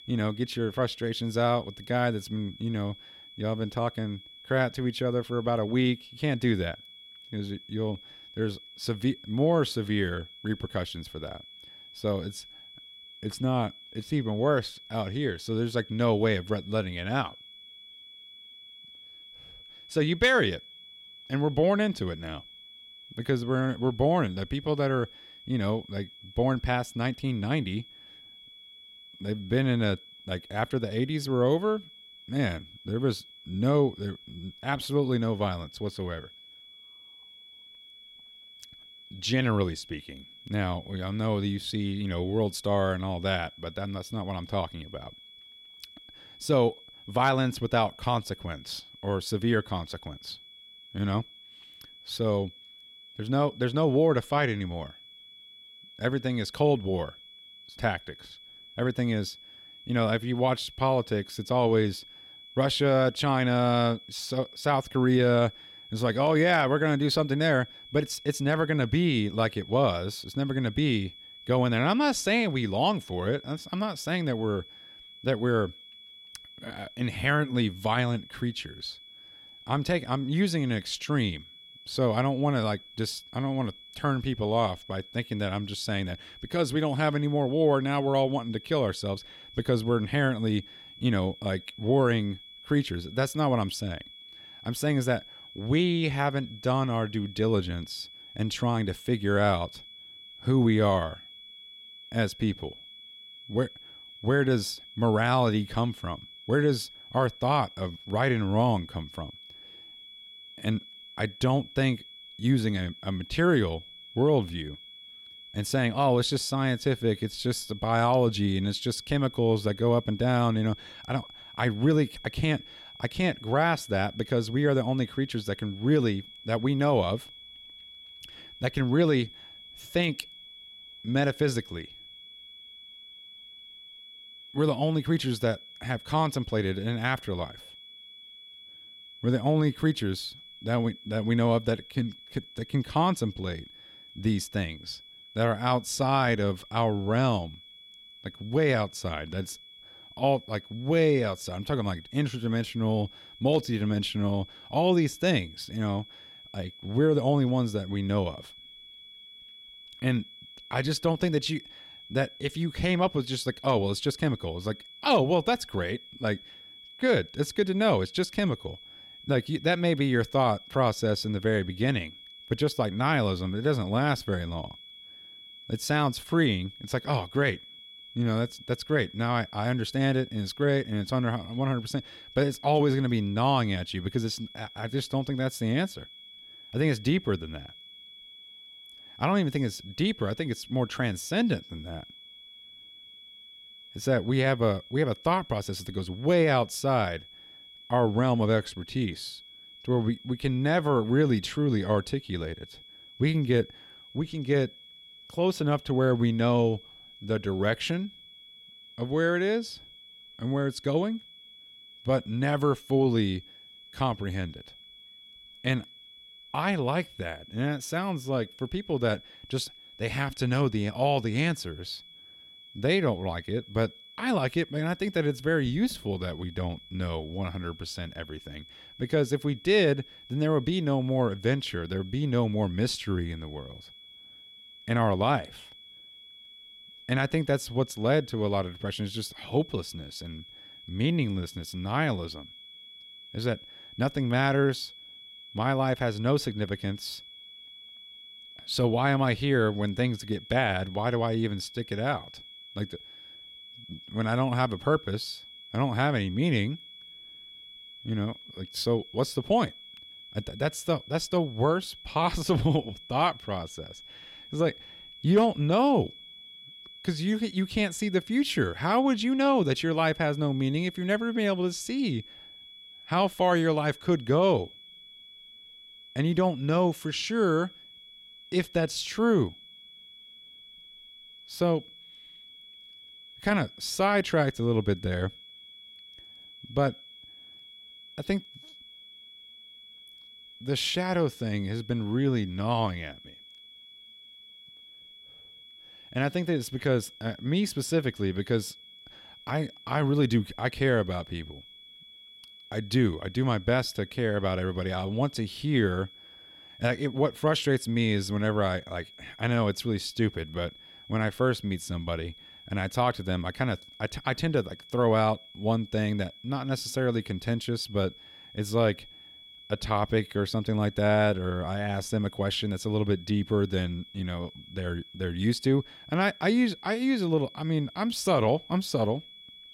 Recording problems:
high-pitched whine; noticeable; throughout; 3.5 kHz, 20 dB below the speech

